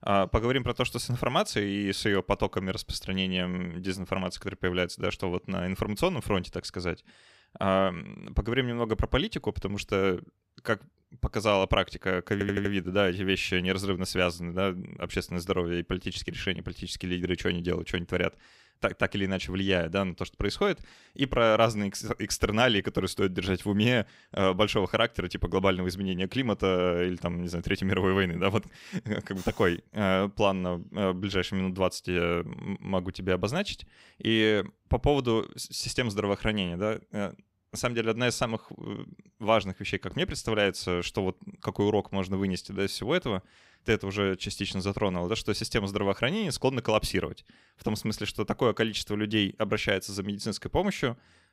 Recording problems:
audio stuttering; at 12 s

